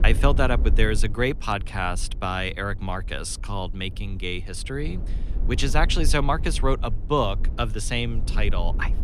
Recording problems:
low rumble; noticeable; throughout; 20 dB below the speech

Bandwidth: 14.5 kHz